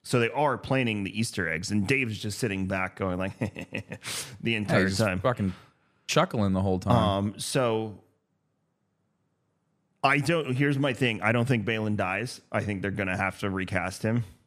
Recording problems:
none

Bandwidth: 14.5 kHz